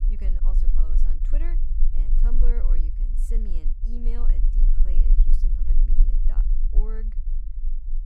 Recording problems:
low rumble; loud; throughout; 4 dB below the speech

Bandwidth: 15.5 kHz